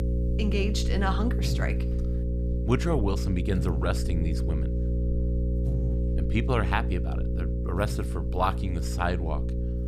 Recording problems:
electrical hum; loud; throughout; 60 Hz, 8 dB below the speech

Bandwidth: 15 kHz